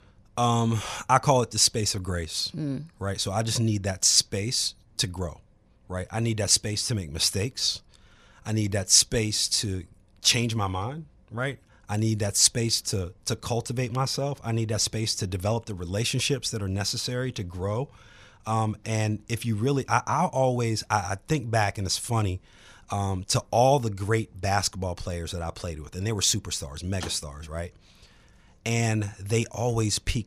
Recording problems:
none

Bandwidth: 14.5 kHz